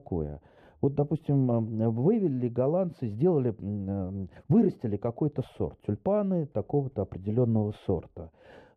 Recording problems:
muffled; very; fading above 1 kHz

